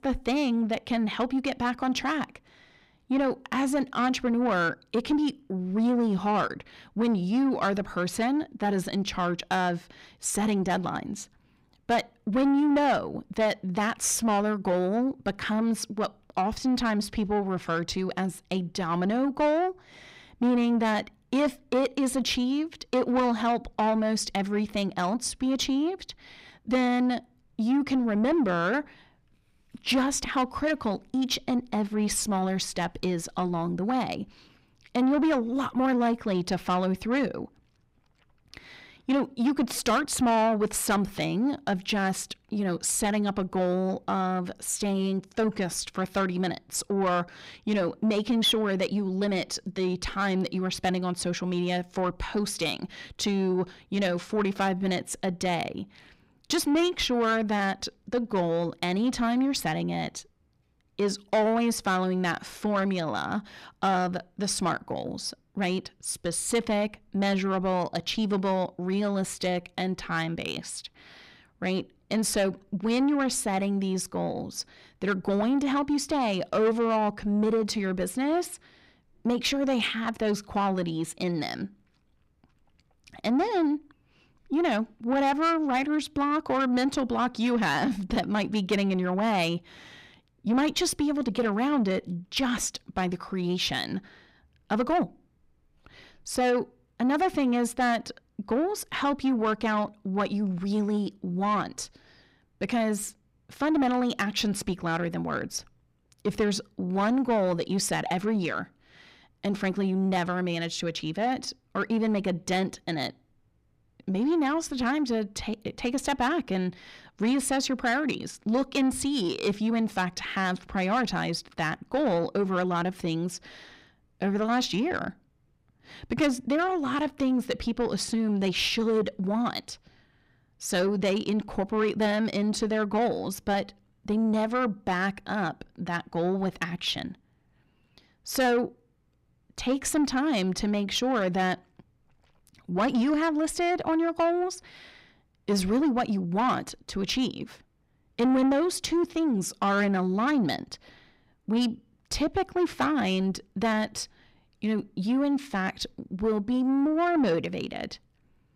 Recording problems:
distortion; slight; 10 dB below the speech

